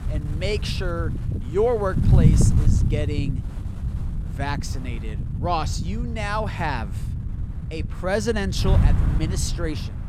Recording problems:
wind noise on the microphone; heavy; 9 dB below the speech

